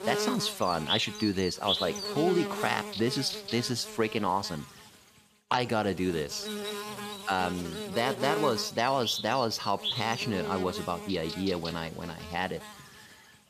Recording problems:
electrical hum; loud; throughout; 50 Hz, 5 dB below the speech

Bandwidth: 14.5 kHz